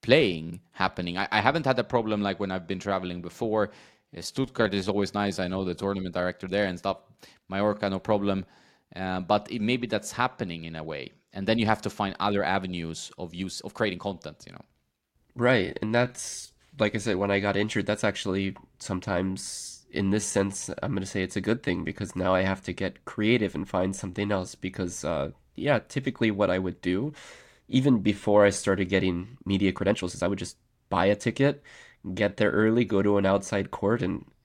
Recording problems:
uneven, jittery; strongly; from 2.5 to 34 s

